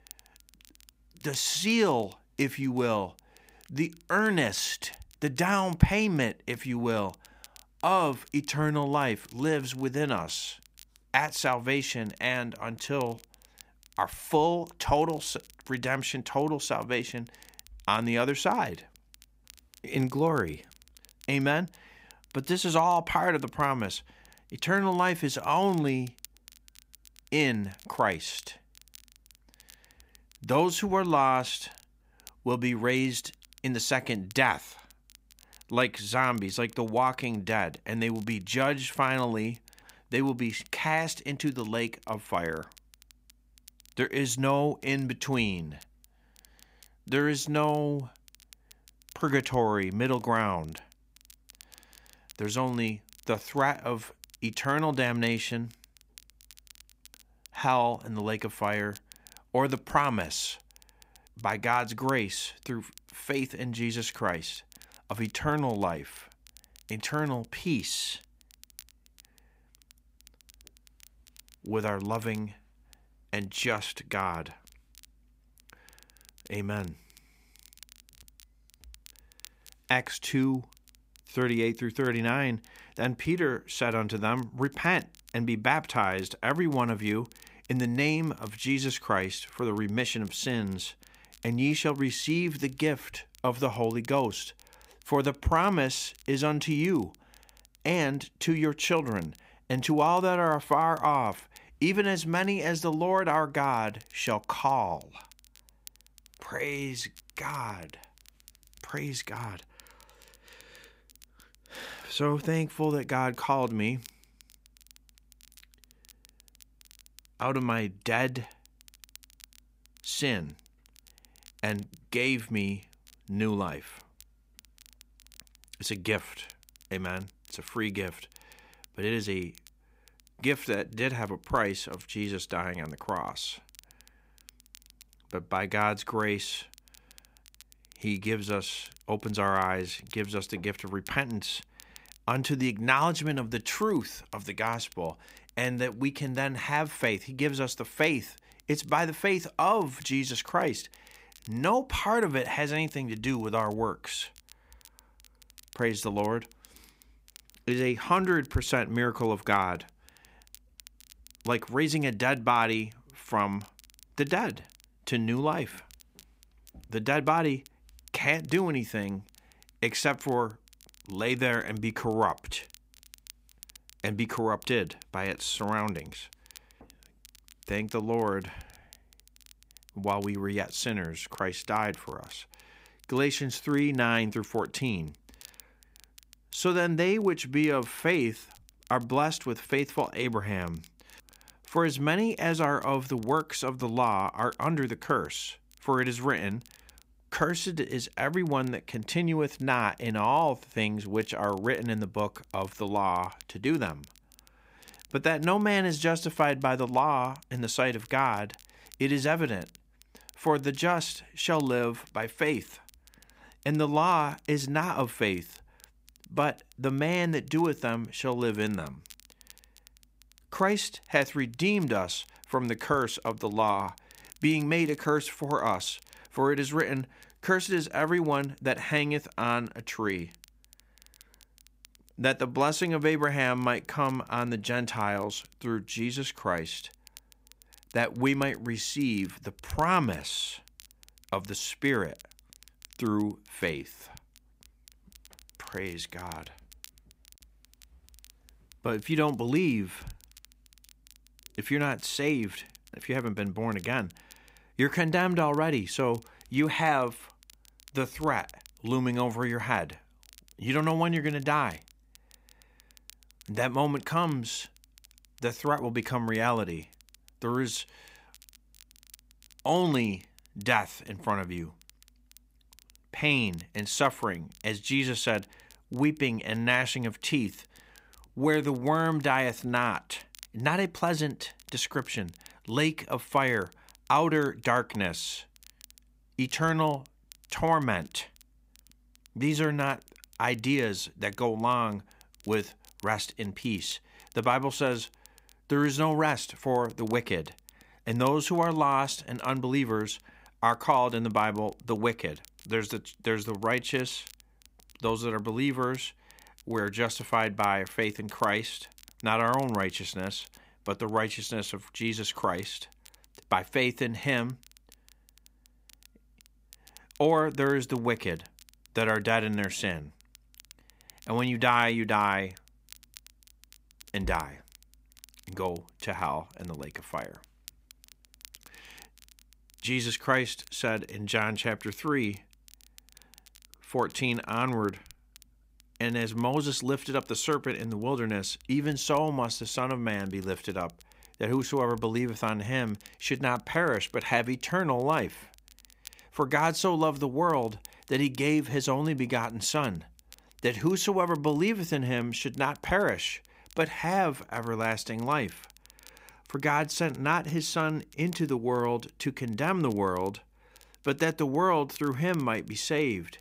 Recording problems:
crackle, like an old record; faint; 25 dB below the speech

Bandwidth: 15.5 kHz